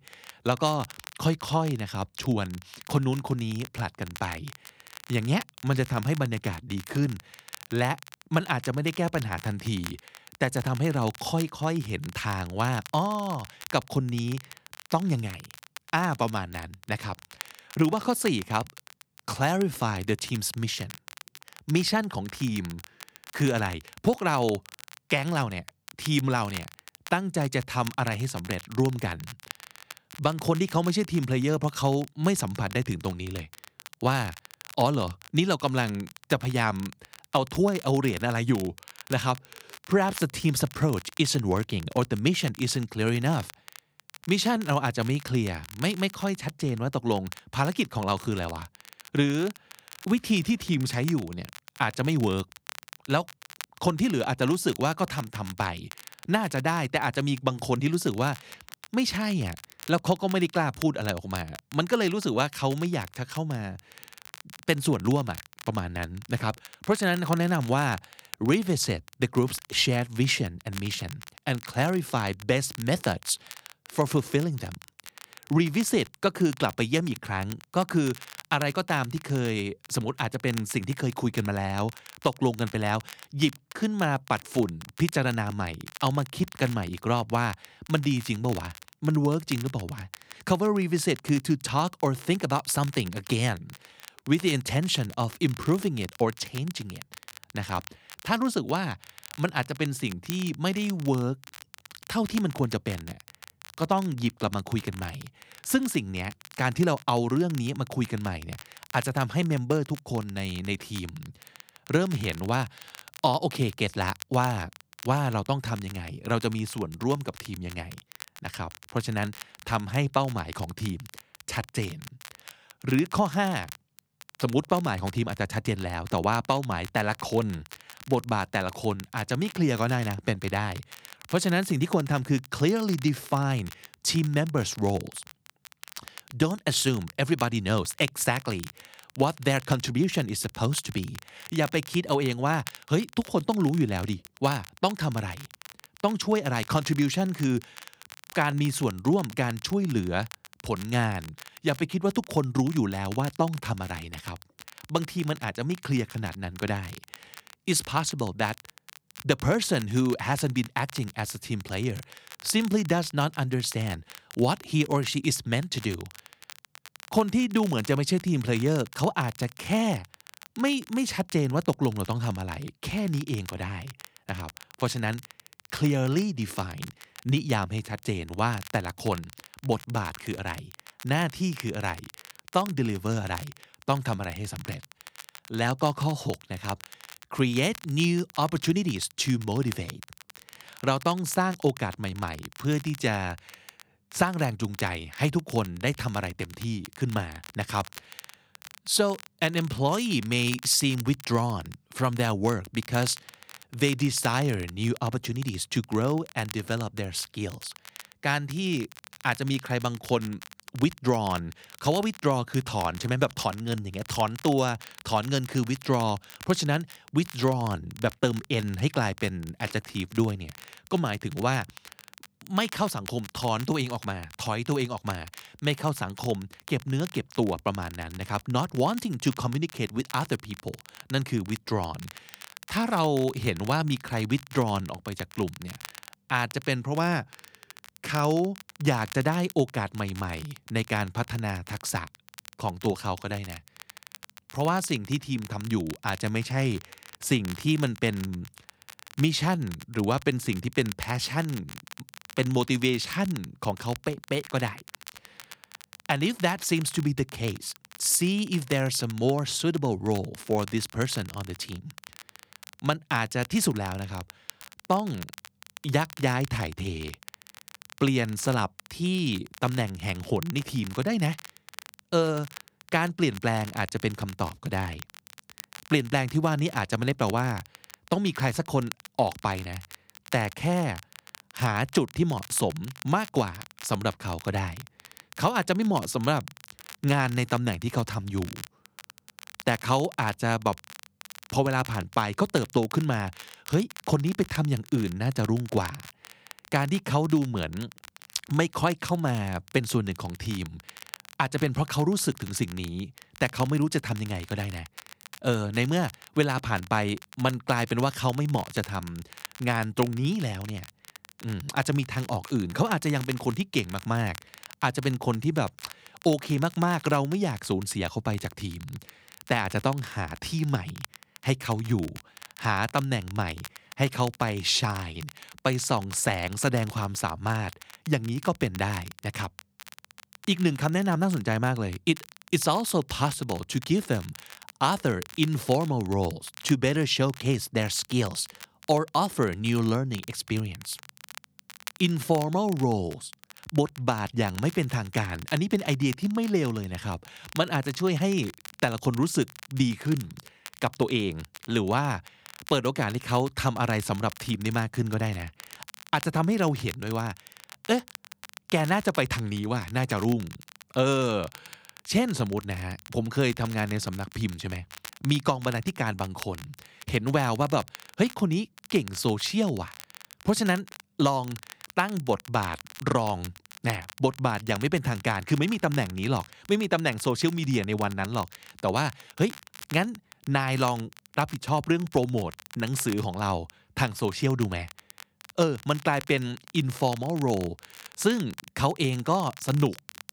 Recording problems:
crackle, like an old record; noticeable; 20 dB below the speech

